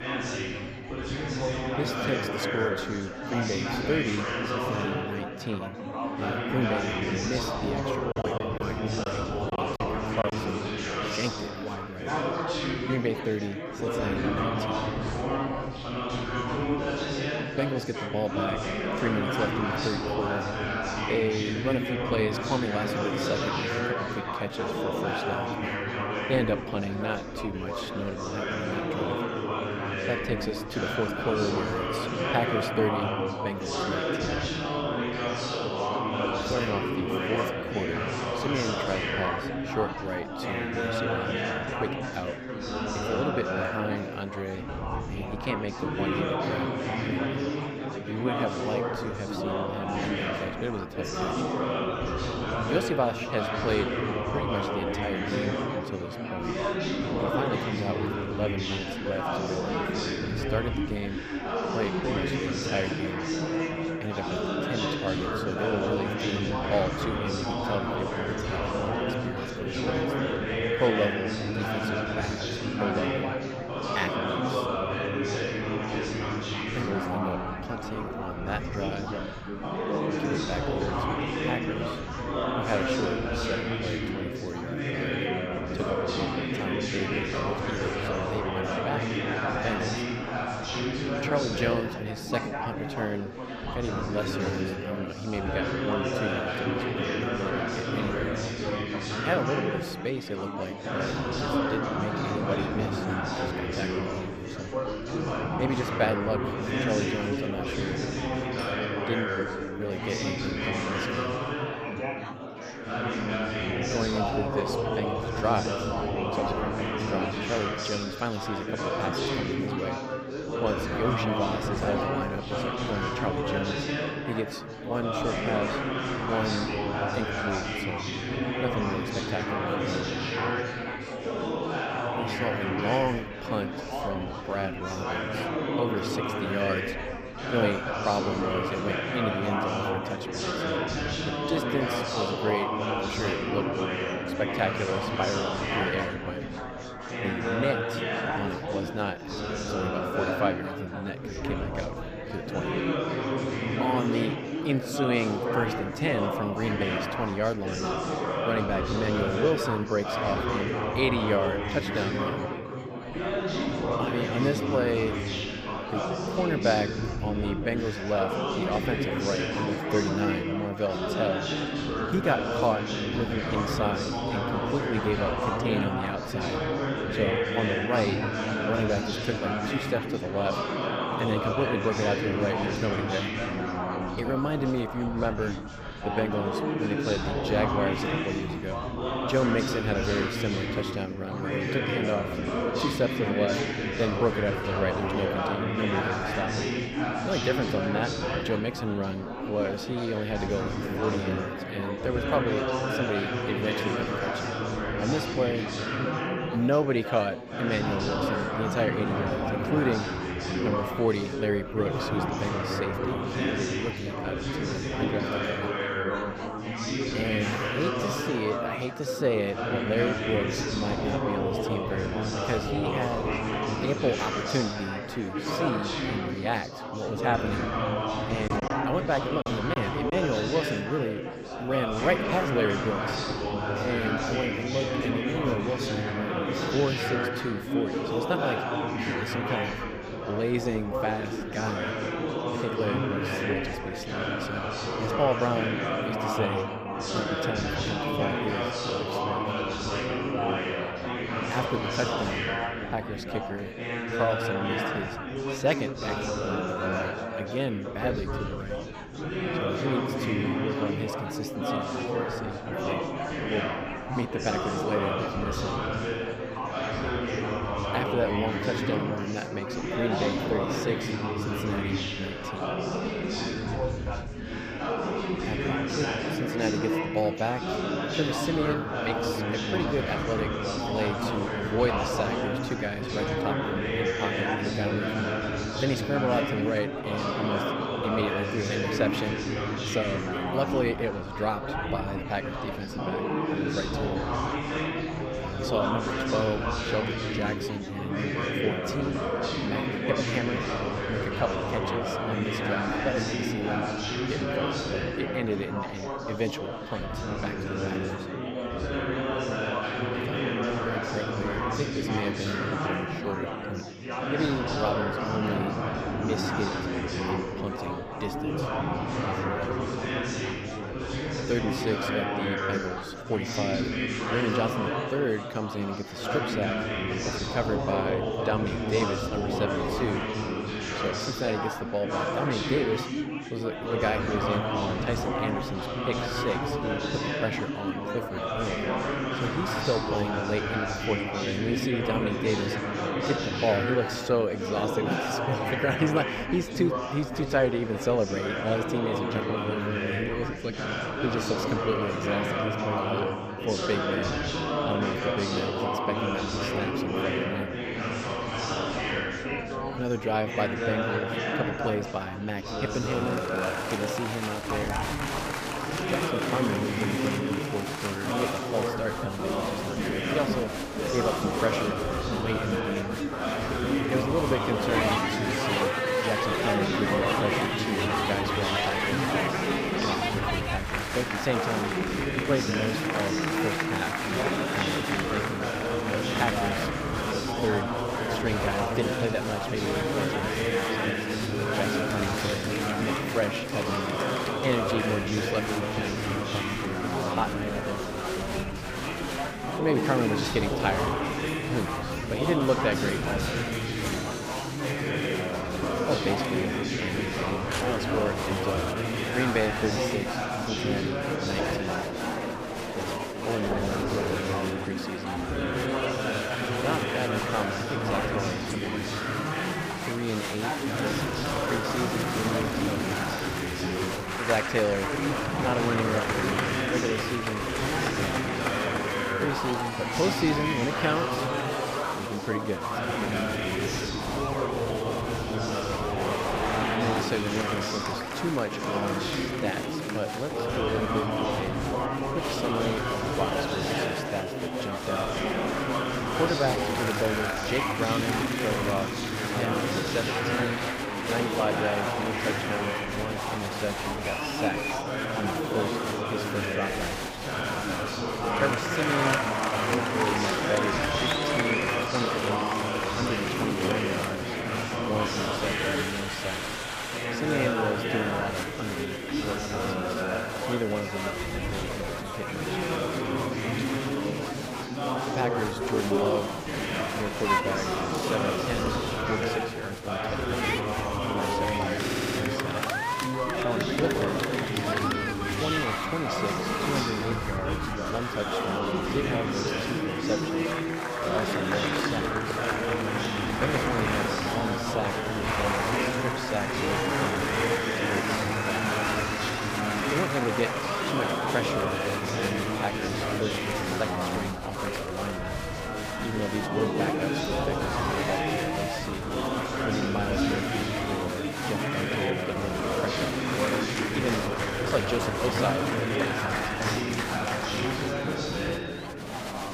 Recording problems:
chatter from many people; very loud; throughout; 3 dB above the speech
choppy; very; from 8 to 10 s and from 3:48 to 3:50; 8% of the speech affected
clattering dishes; faint; at 1:49; peak 10 dB below the speech
phone ringing; faint; from 1:51 to 1:53; peak 15 dB below the speech
siren; noticeable; from 7:11 to 7:18; peak 4 dB below the speech
audio stuttering; at 8:02

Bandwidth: 15 kHz